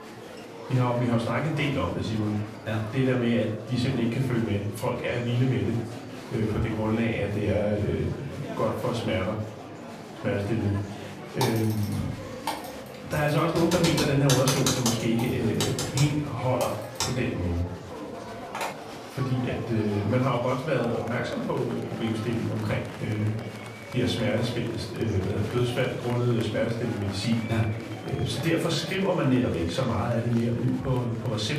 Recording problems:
off-mic speech; far
room echo; slight; dies away in 0.5 s
murmuring crowd; noticeable; throughout; 10 dB below the speech
background music; faint; throughout; 30 dB below the speech
keyboard typing; loud; from 11 to 19 s; peak 1 dB above the speech

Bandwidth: 14.5 kHz